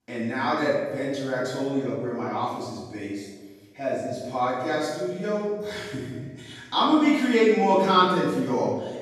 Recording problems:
room echo; strong; dies away in 1.2 s
off-mic speech; far

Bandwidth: 13.5 kHz